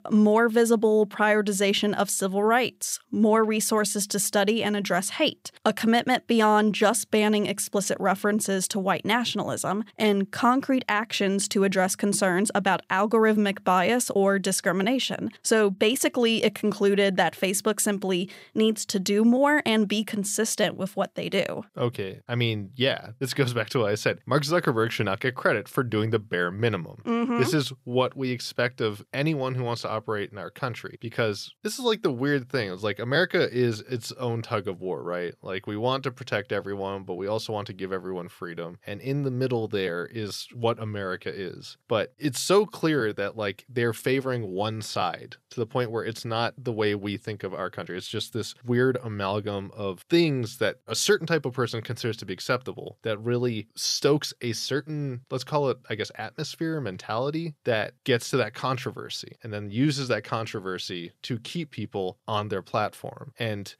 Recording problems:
none

